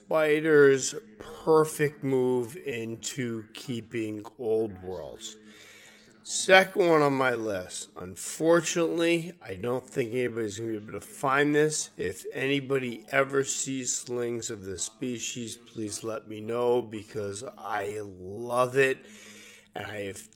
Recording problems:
wrong speed, natural pitch; too slow; 0.6 times normal speed
voice in the background; faint; throughout; 30 dB below the speech

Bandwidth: 17 kHz